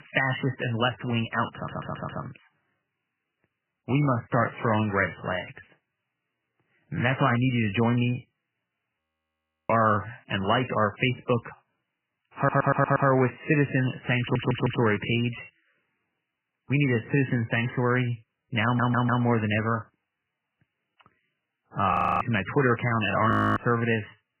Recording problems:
garbled, watery; badly; nothing above 3 kHz
audio stuttering; 4 times, first at 1.5 s
audio freezing; at 9 s for 0.5 s, at 22 s and at 23 s

